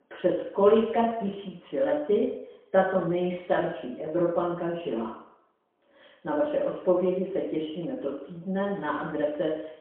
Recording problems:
phone-call audio; poor line; nothing above 3 kHz
off-mic speech; far
room echo; noticeable; dies away in 0.7 s

